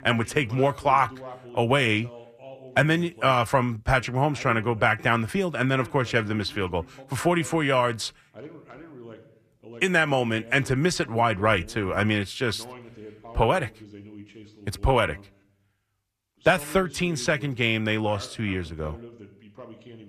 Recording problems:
voice in the background; faint; throughout; 20 dB below the speech

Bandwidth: 14.5 kHz